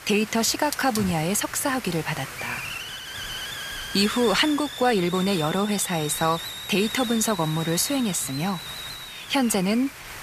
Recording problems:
hiss; loud; throughout; 9 dB below the speech

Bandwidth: 14.5 kHz